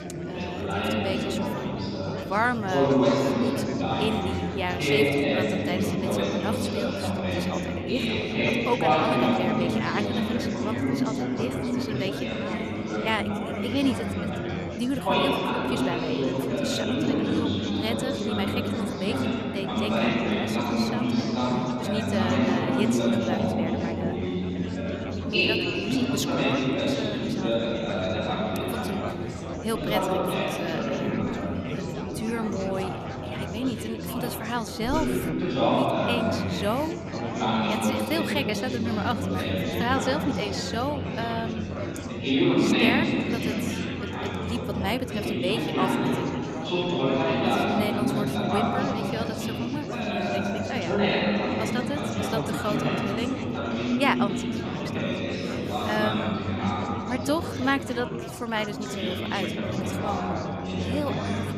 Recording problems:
chatter from many people; very loud; throughout; 5 dB above the speech

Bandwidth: 14 kHz